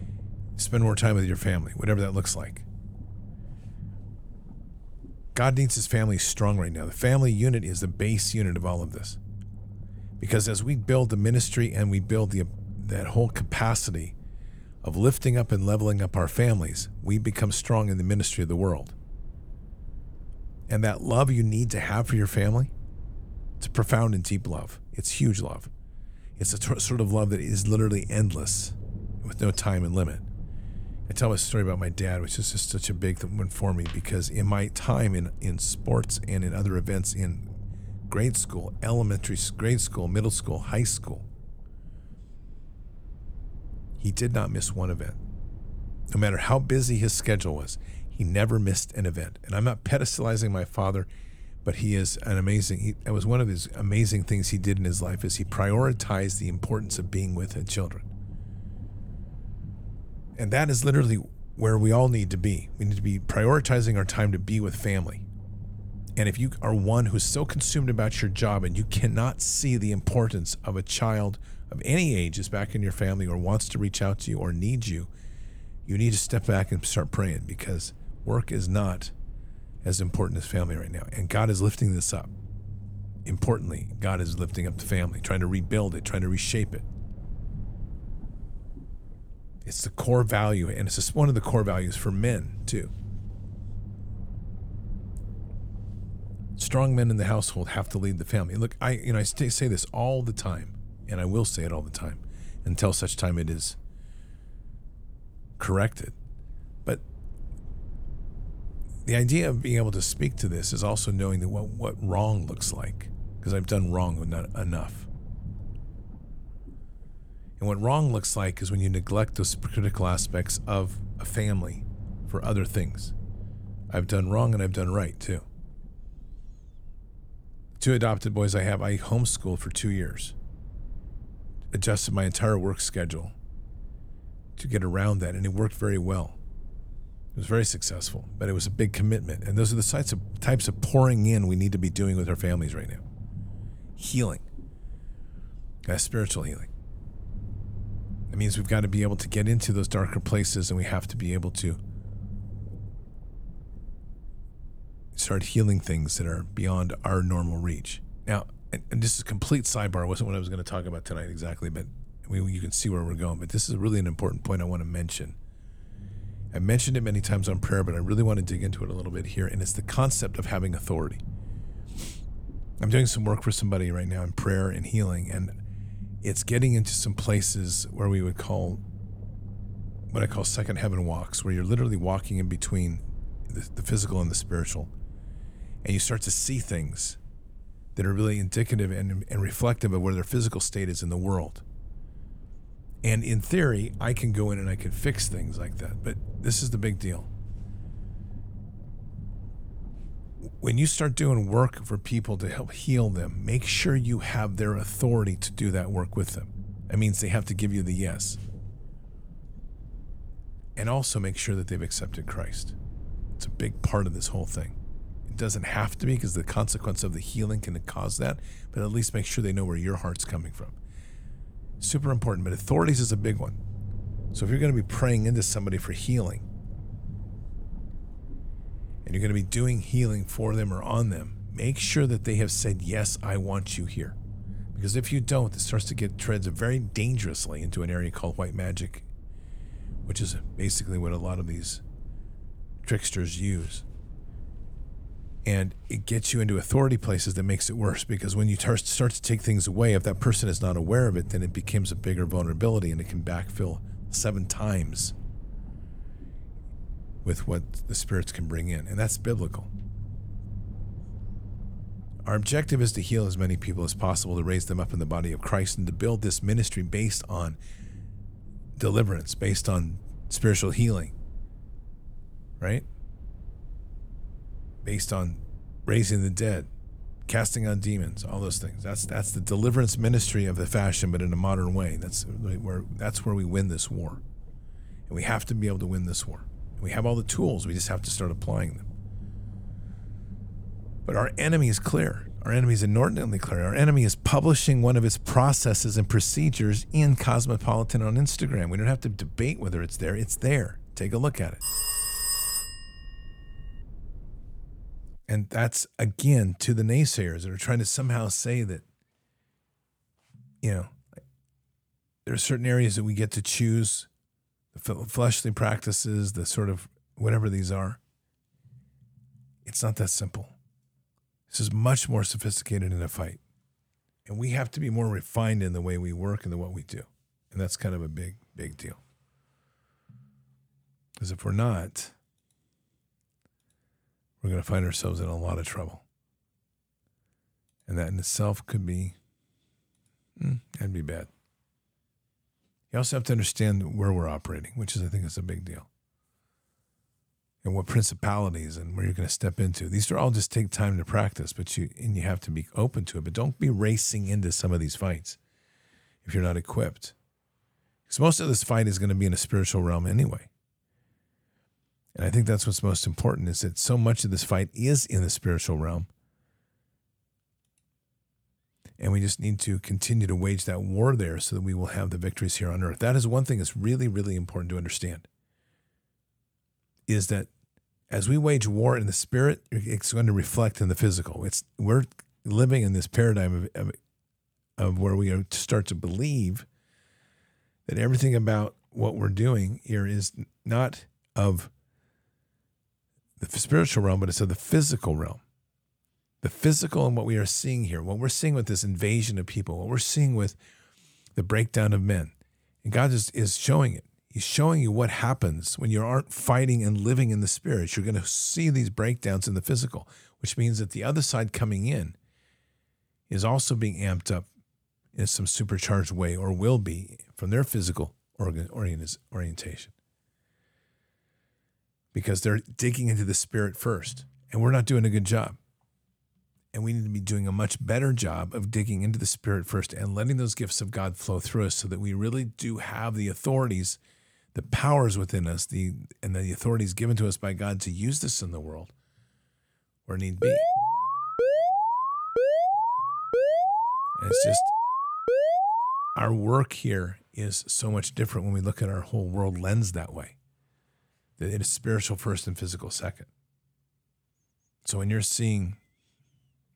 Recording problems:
low rumble; faint; until 5:05; 25 dB below the speech
phone ringing; loud; from 5:02 to 5:03; peak 2 dB above the speech
alarm; loud; from 7:20 to 7:26; peak 4 dB above the speech

